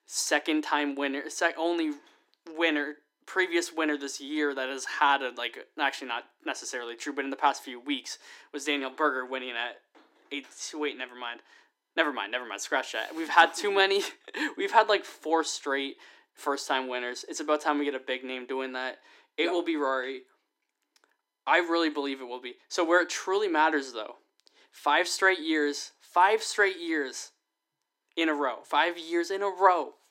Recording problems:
thin; somewhat; fading below 300 Hz

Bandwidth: 16 kHz